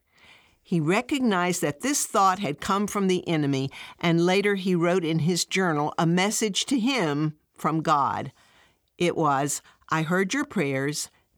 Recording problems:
none

